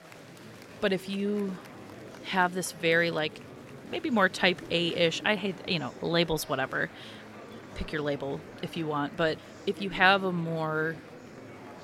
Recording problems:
murmuring crowd; noticeable; throughout; 15 dB below the speech

